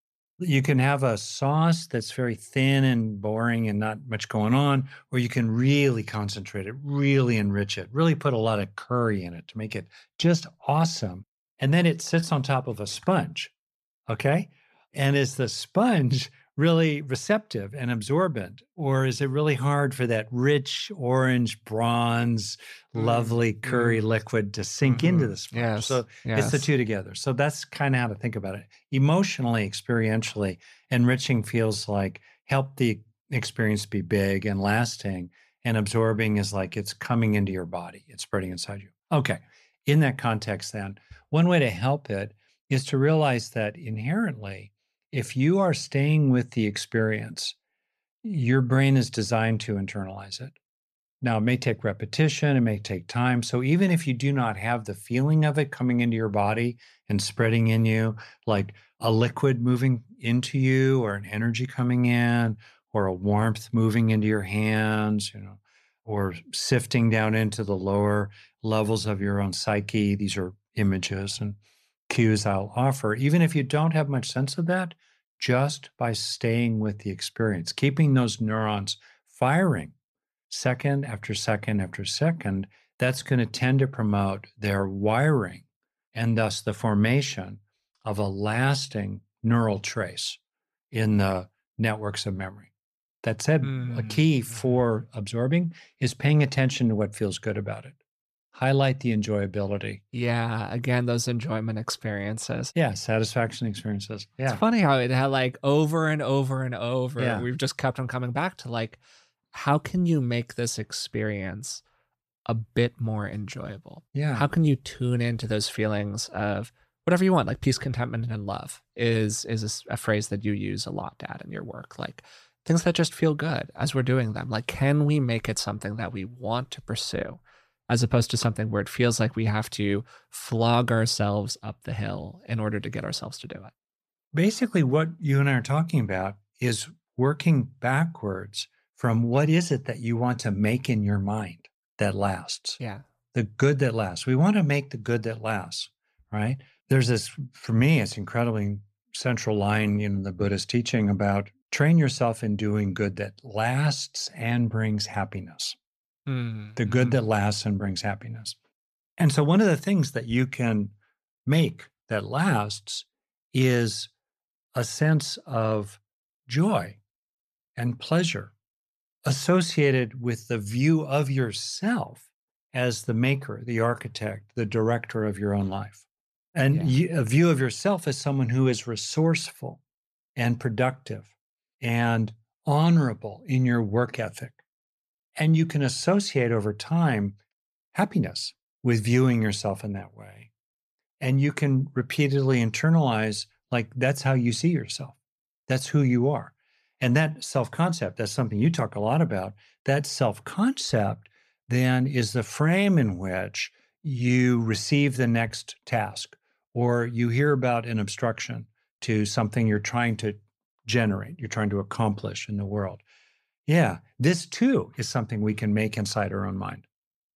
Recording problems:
none

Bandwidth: 14 kHz